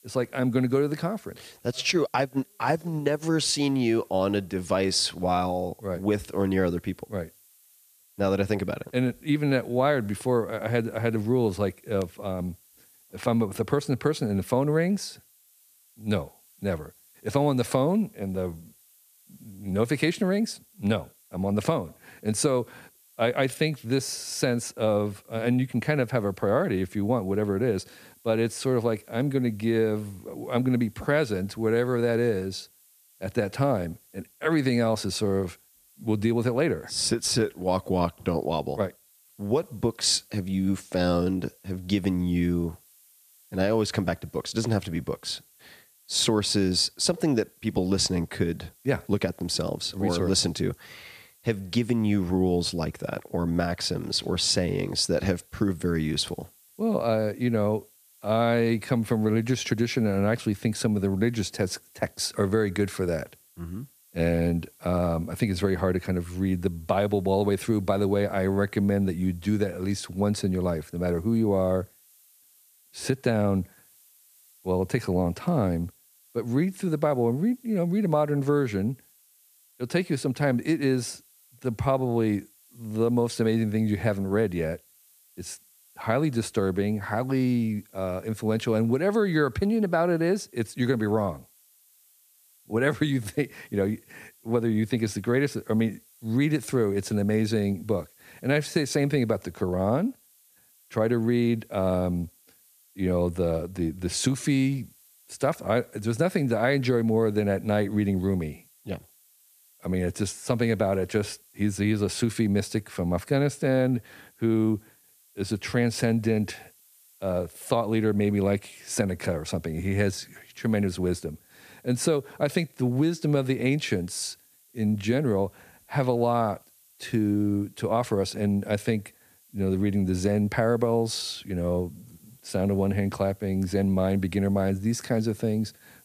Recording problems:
hiss; faint; throughout; 30 dB below the speech

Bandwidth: 14.5 kHz